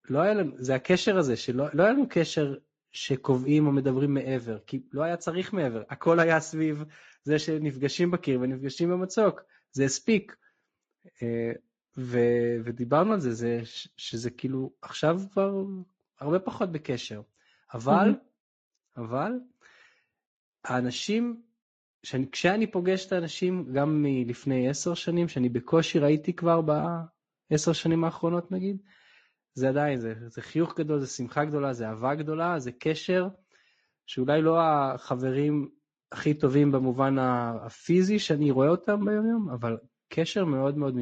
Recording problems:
garbled, watery; slightly; nothing above 7.5 kHz
abrupt cut into speech; at the end

